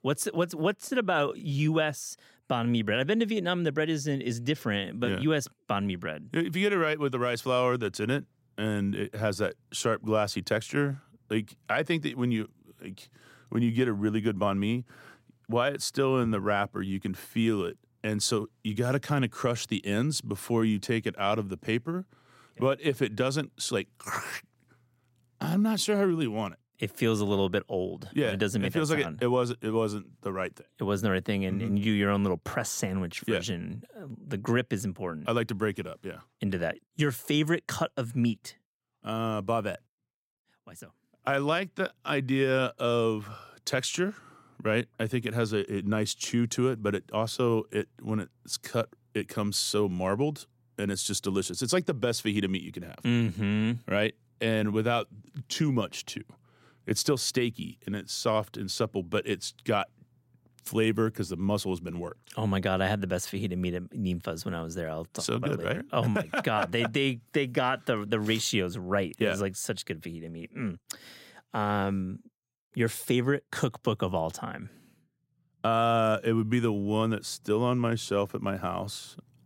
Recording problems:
none

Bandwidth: 16 kHz